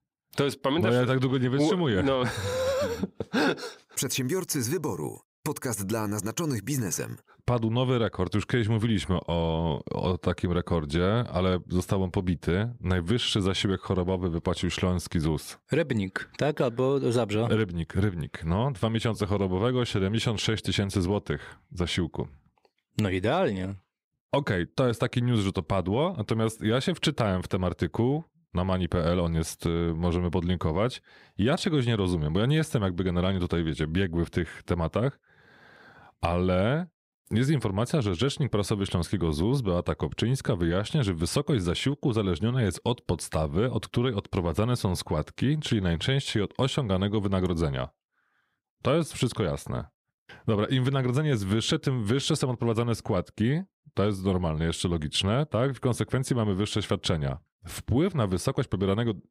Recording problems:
none

